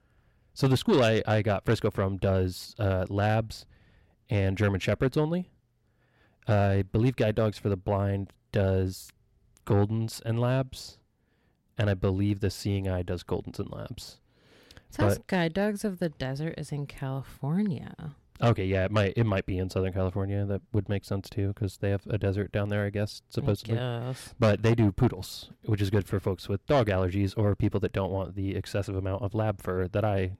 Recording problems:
distortion; slight; 10 dB below the speech

